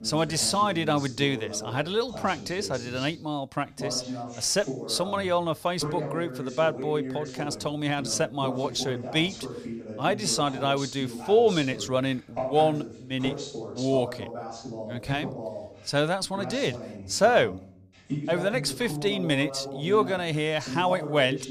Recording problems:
voice in the background; loud; throughout; 10 dB below the speech

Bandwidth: 15 kHz